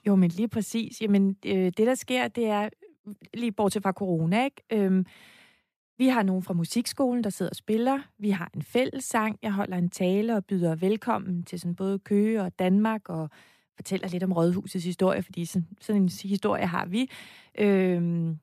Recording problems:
none

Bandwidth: 14.5 kHz